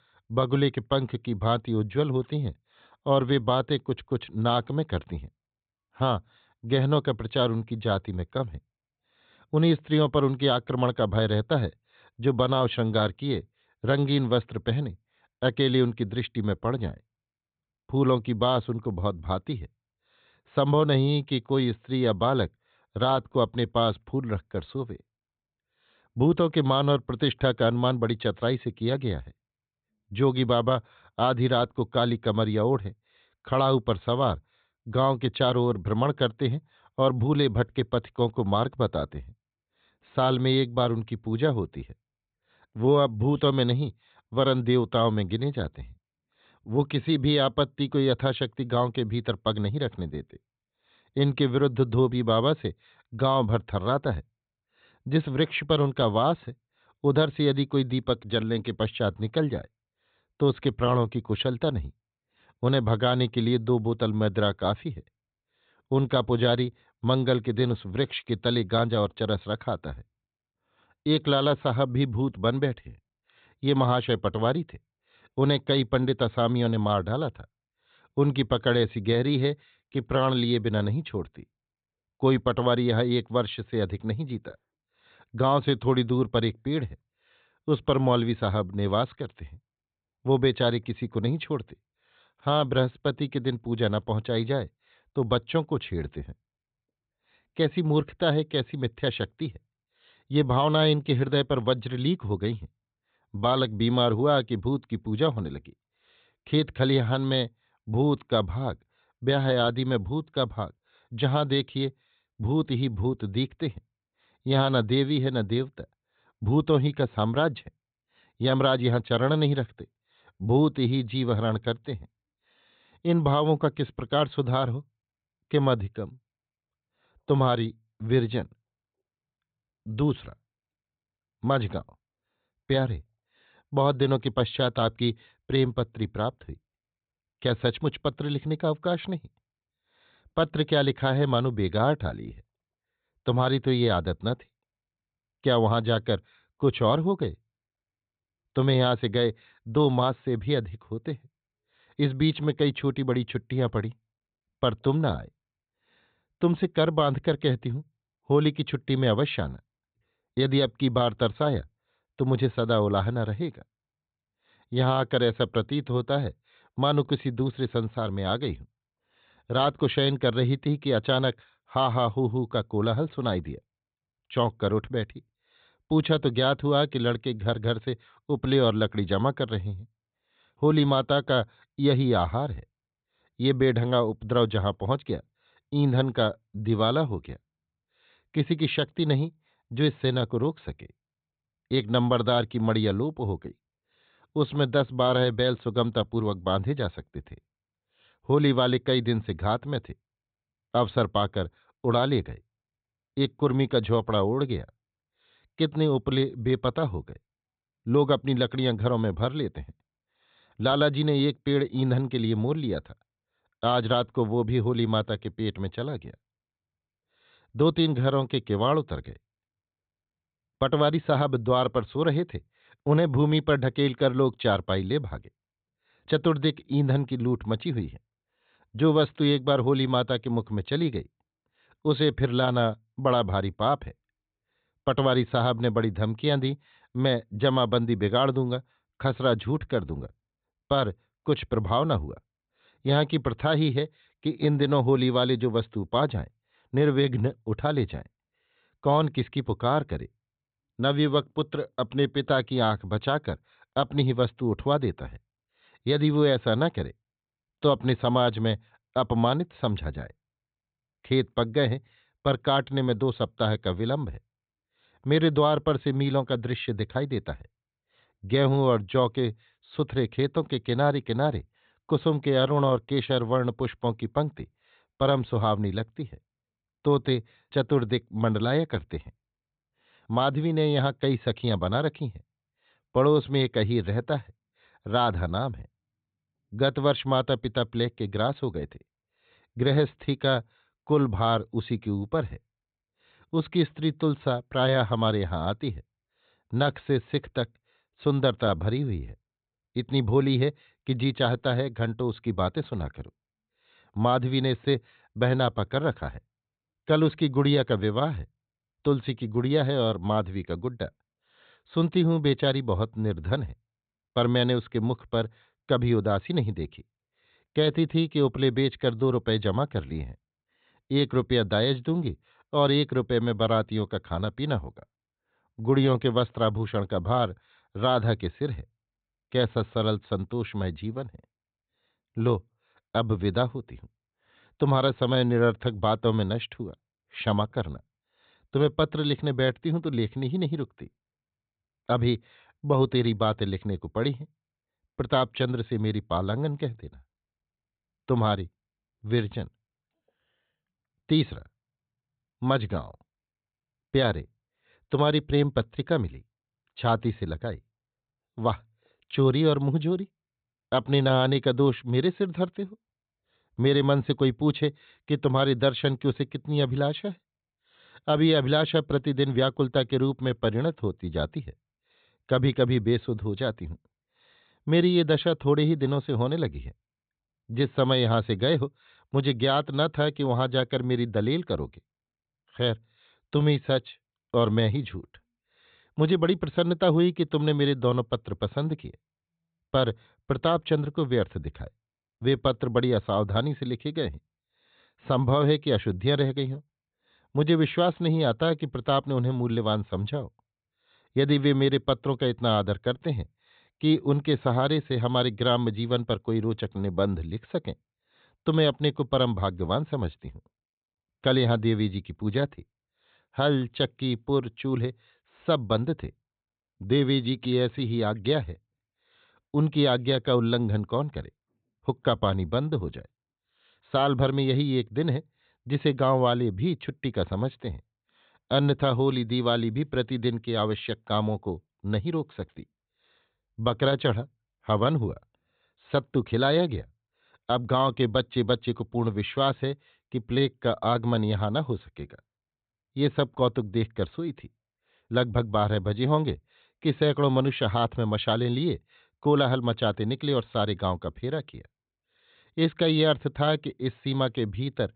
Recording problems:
high frequencies cut off; severe; nothing above 4 kHz

